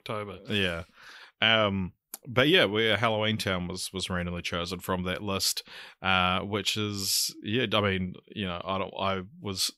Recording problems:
none

